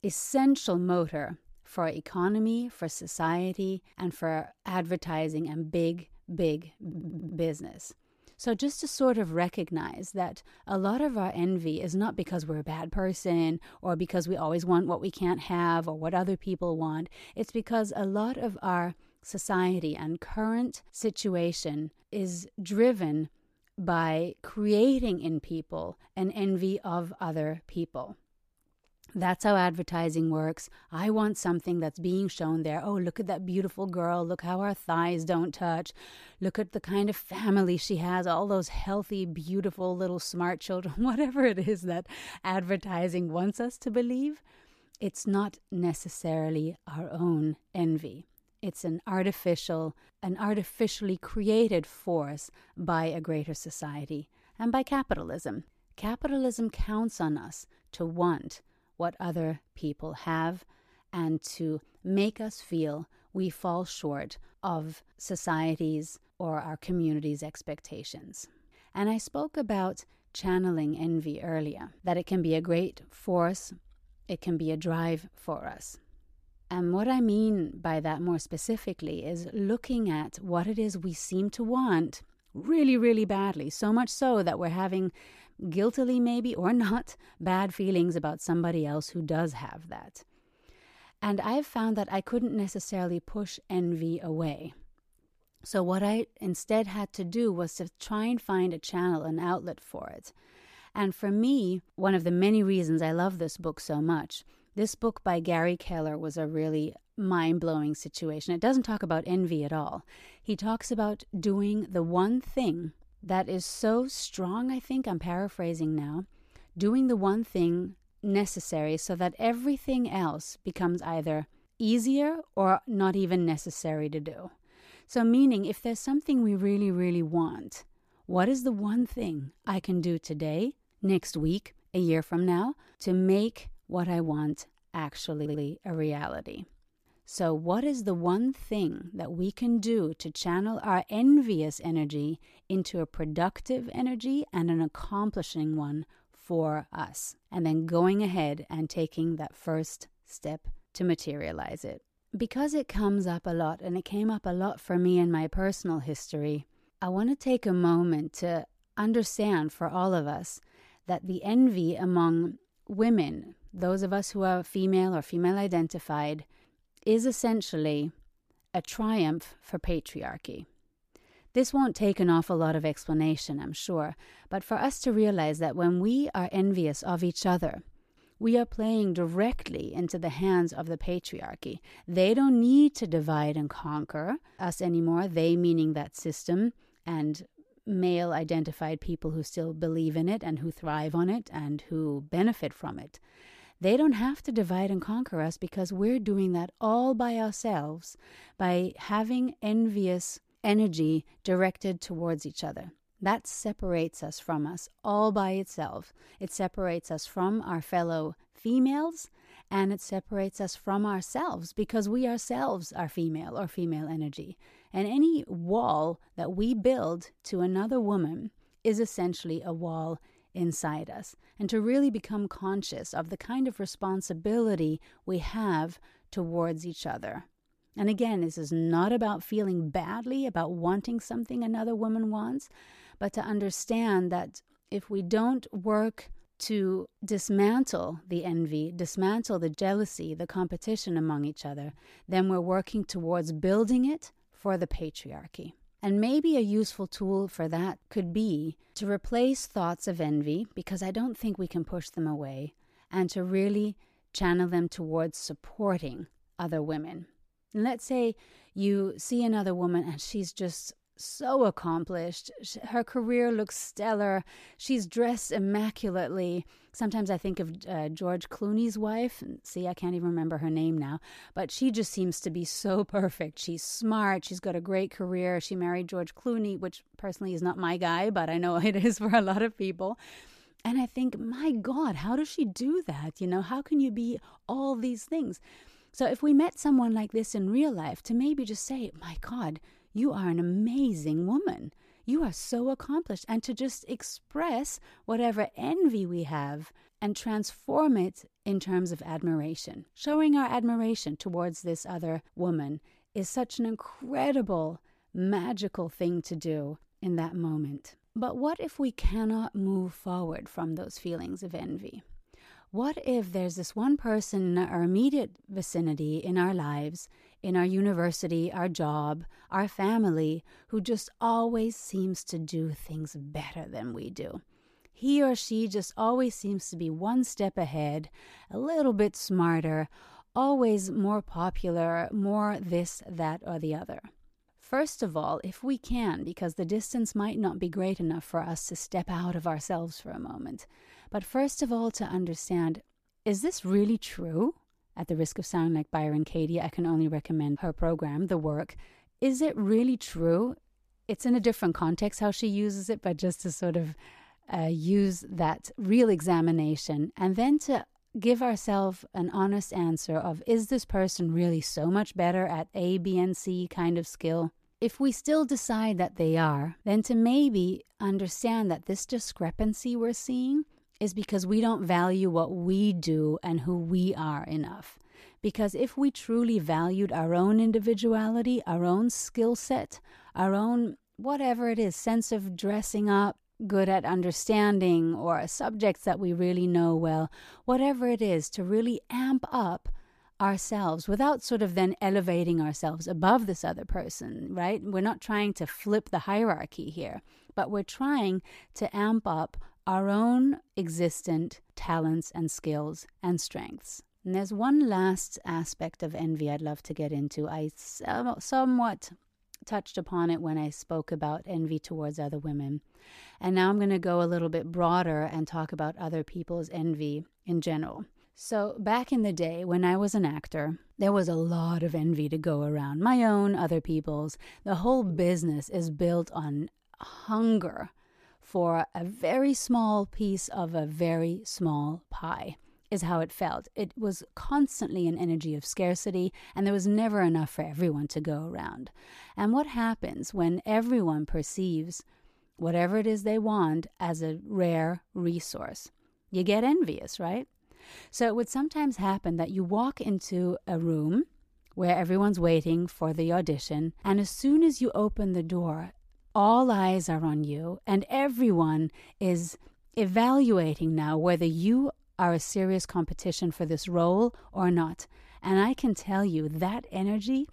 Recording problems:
audio stuttering; at 7 s and at 2:15

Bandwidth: 14.5 kHz